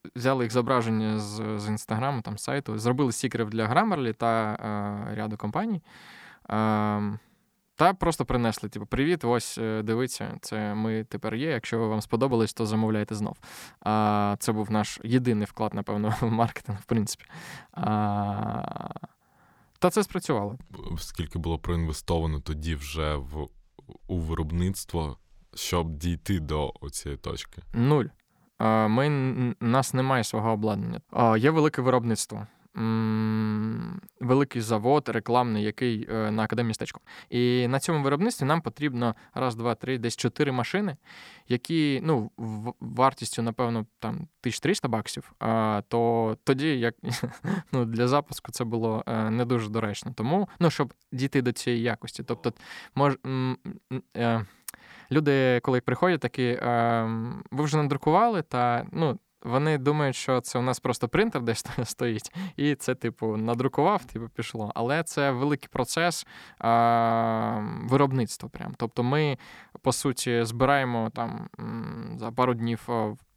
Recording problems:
uneven, jittery; strongly; from 21 to 56 s

